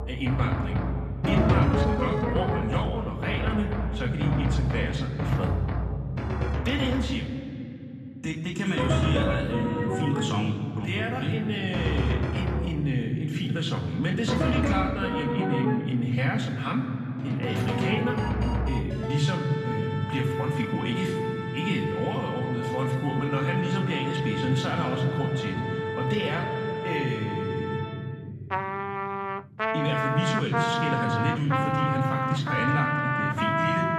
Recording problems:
off-mic speech; far
room echo; noticeable; dies away in 3 s
background music; loud; throughout; 1 dB below the speech

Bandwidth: 14.5 kHz